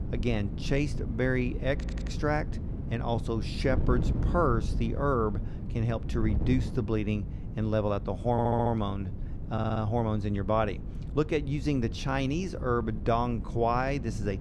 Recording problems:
wind noise on the microphone; occasional gusts; 15 dB below the speech
audio stuttering; at 2 s, at 8.5 s and at 9.5 s

